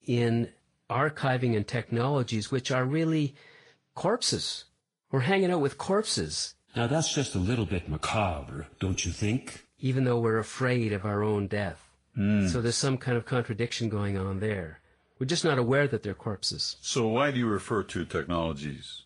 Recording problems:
garbled, watery; slightly; nothing above 10.5 kHz

